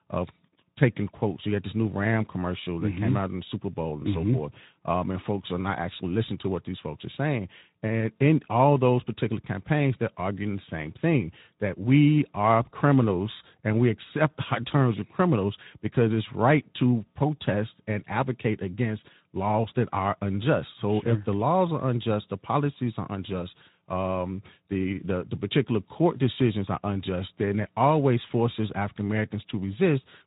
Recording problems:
high frequencies cut off; severe; nothing above 4 kHz
garbled, watery; slightly

